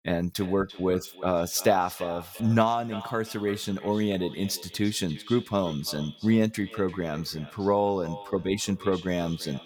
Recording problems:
echo of what is said; noticeable; throughout; 340 ms later, 15 dB below the speech

